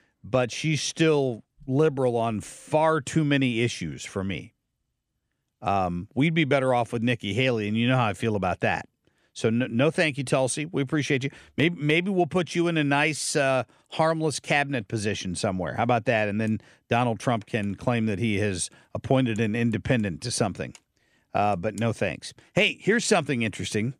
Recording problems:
none

